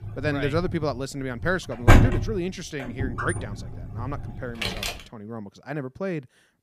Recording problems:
household noises; very loud; until 5 s; 5 dB above the speech

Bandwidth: 15 kHz